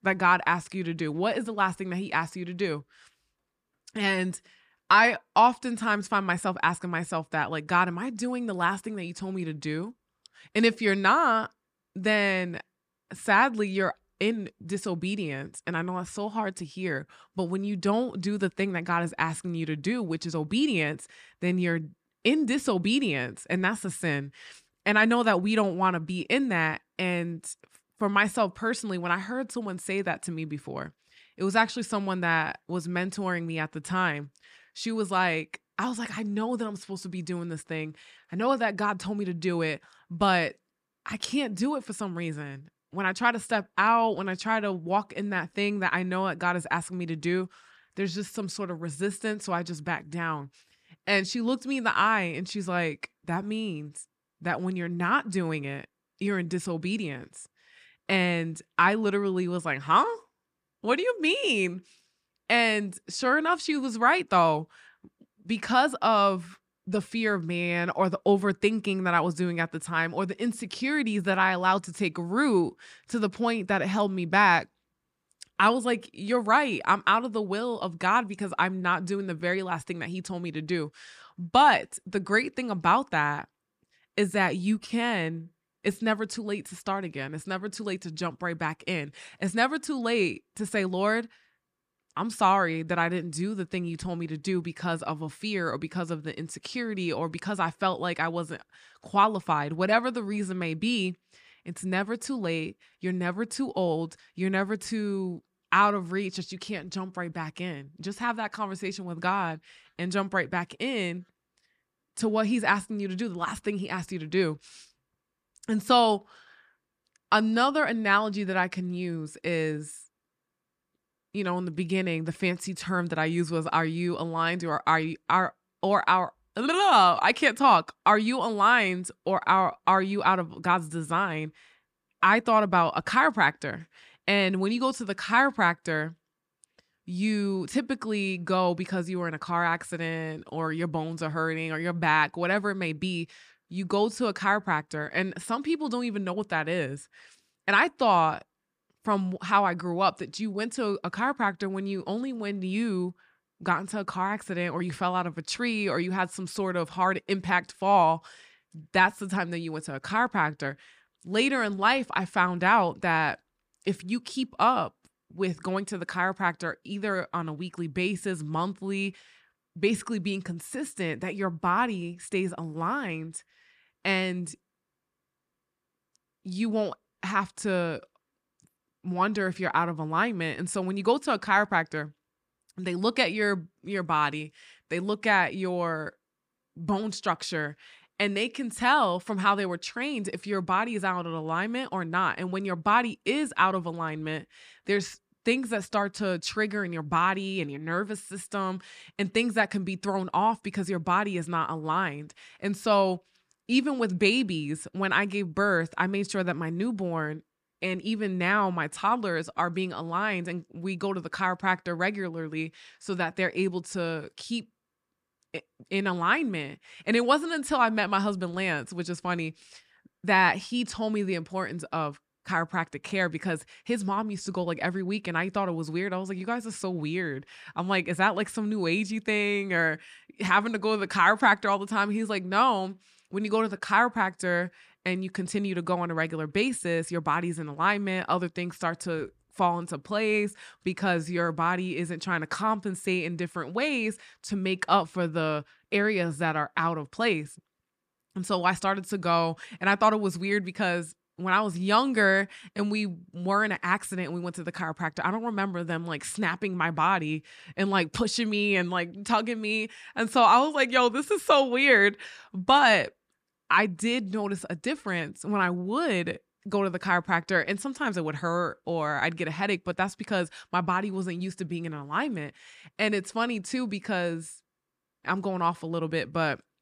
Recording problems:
none

